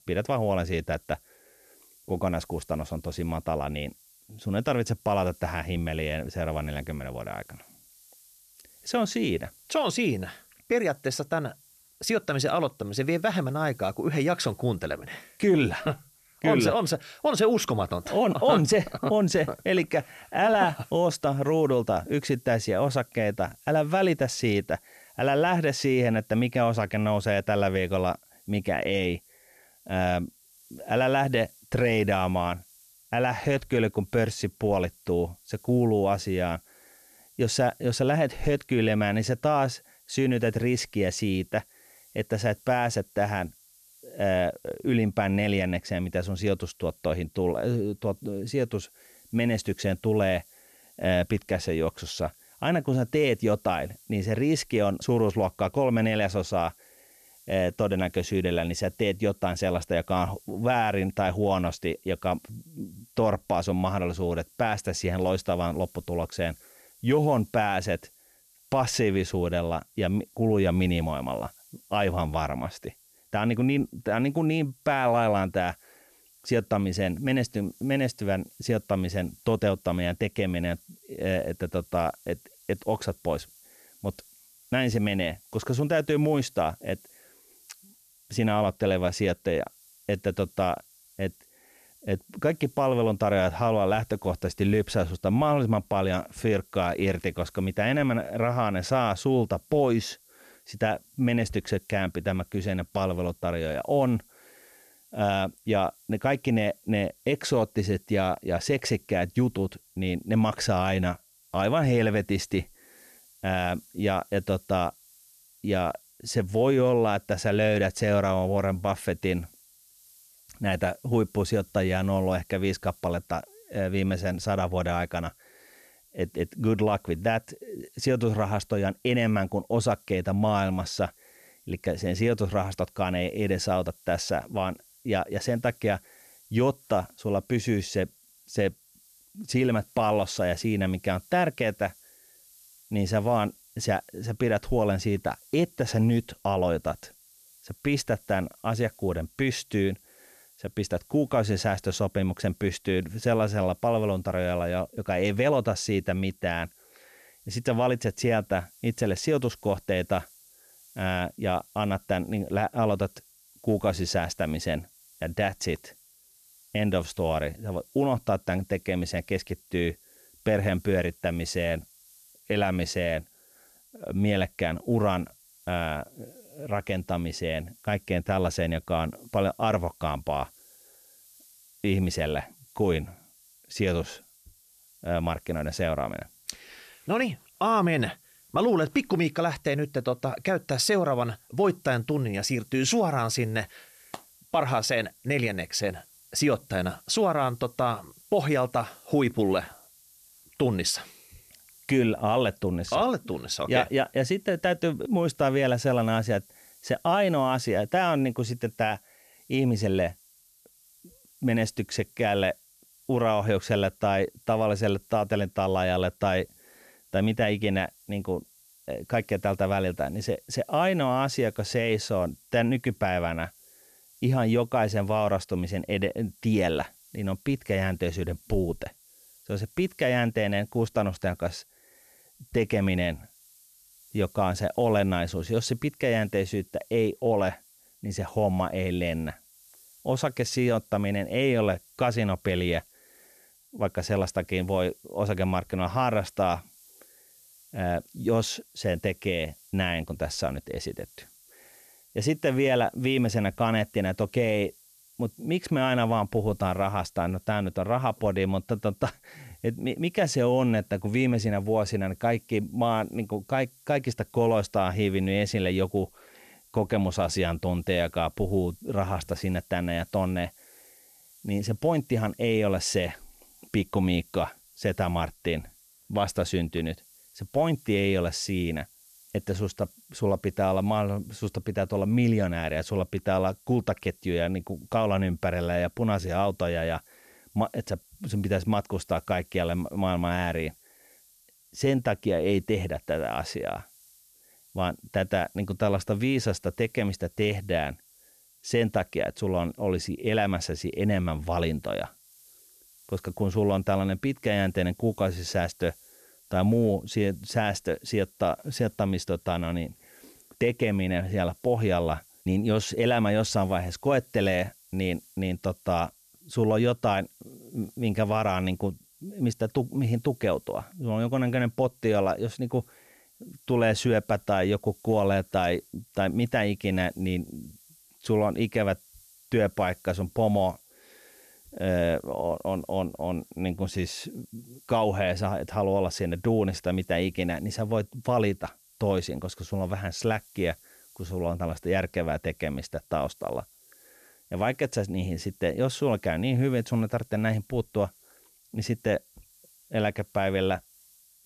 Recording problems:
hiss; faint; throughout; 25 dB below the speech

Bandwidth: 14 kHz